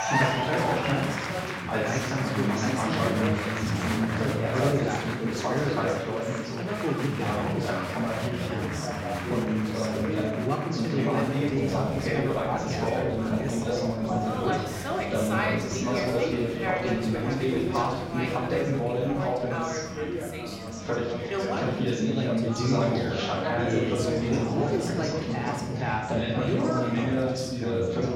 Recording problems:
off-mic speech; far
room echo; noticeable; dies away in 0.7 s
chatter from many people; very loud; throughout; 4 dB above the speech

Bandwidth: 16 kHz